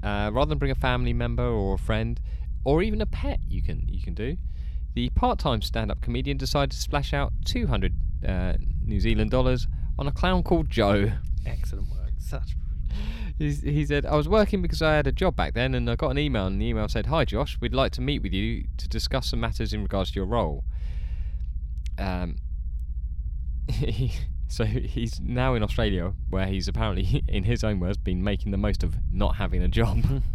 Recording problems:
low rumble; faint; throughout; 25 dB below the speech

